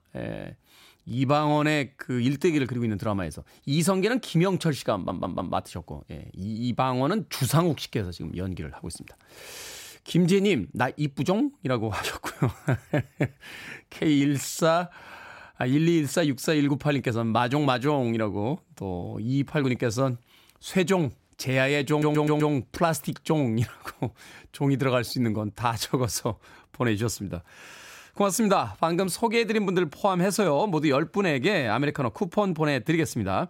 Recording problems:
audio stuttering; at 5 s and at 22 s

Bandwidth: 16 kHz